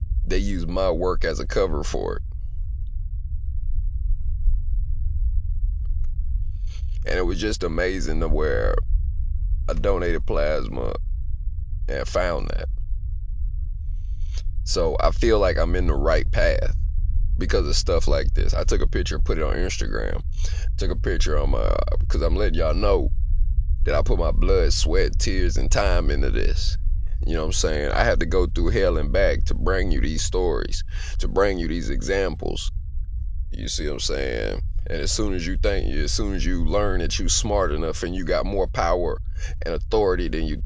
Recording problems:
low rumble; faint; throughout; 25 dB below the speech

